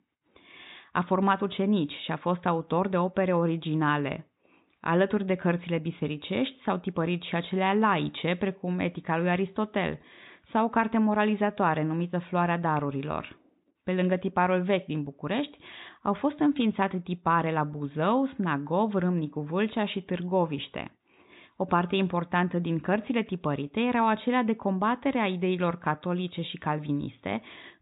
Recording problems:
high frequencies cut off; severe; nothing above 4 kHz

